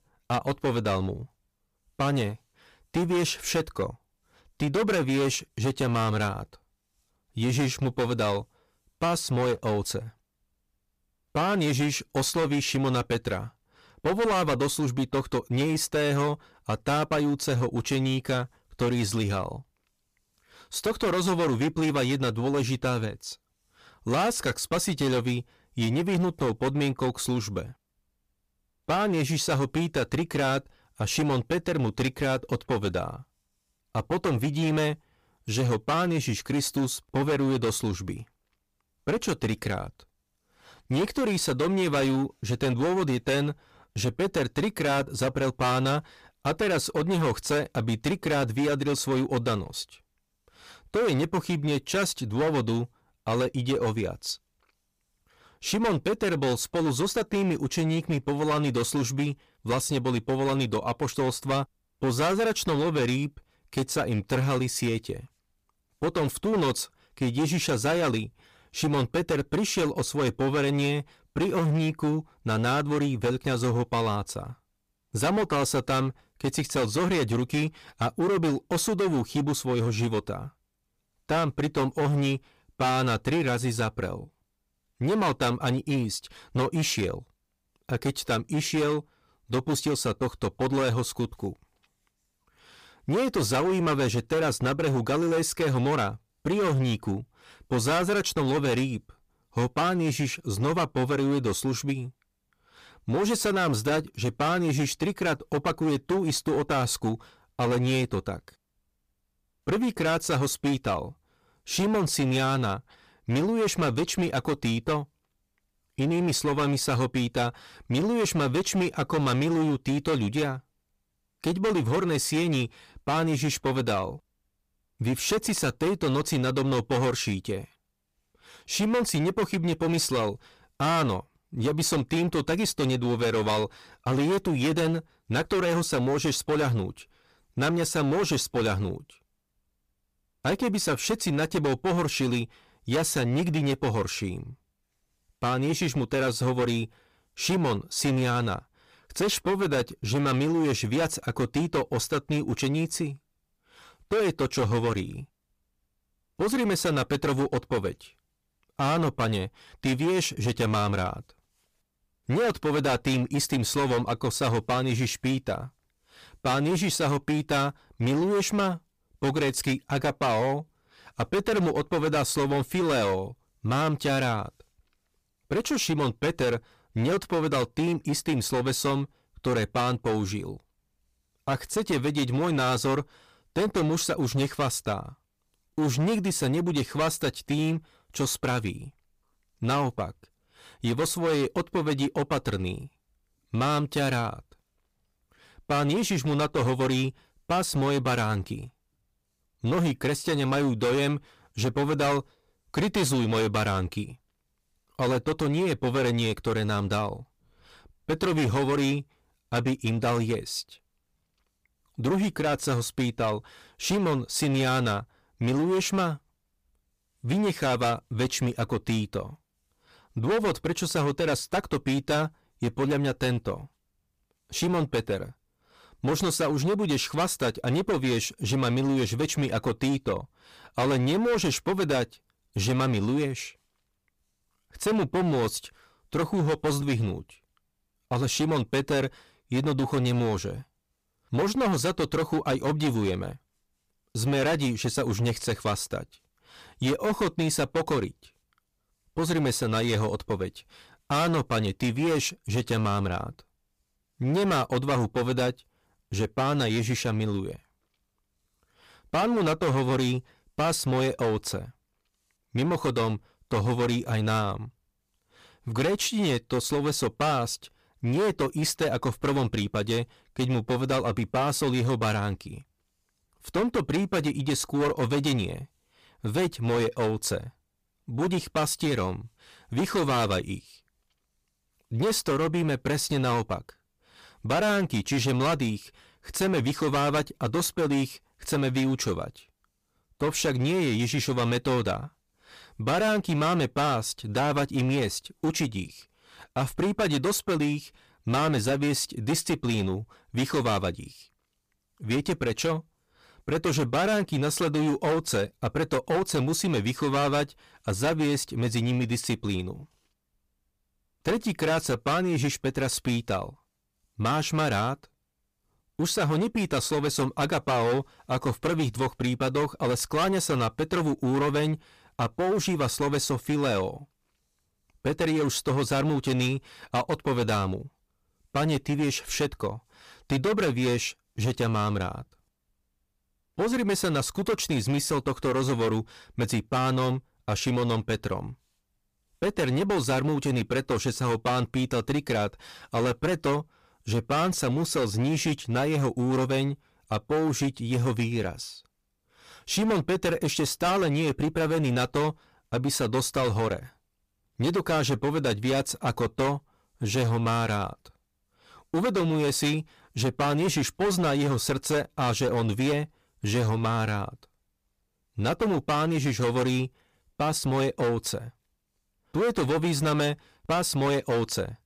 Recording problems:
distortion; heavy; 15% of the sound clipped

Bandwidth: 15 kHz